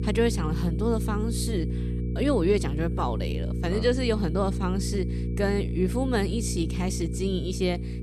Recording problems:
electrical hum; loud; throughout; 60 Hz, 10 dB below the speech
high-pitched whine; faint; throughout; 2.5 kHz, 35 dB below the speech

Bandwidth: 13.5 kHz